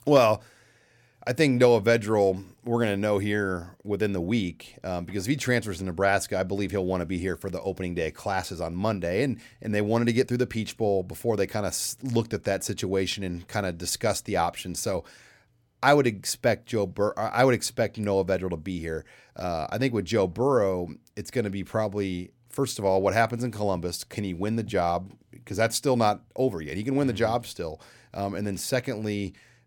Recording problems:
none

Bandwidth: 17.5 kHz